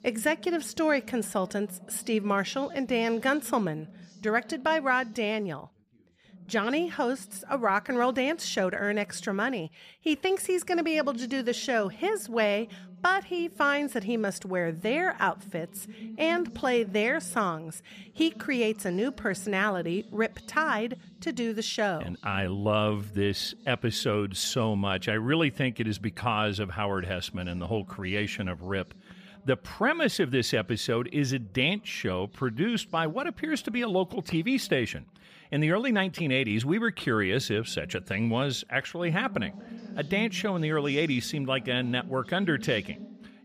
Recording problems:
background chatter; noticeable; throughout; 2 voices, 20 dB below the speech

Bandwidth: 14.5 kHz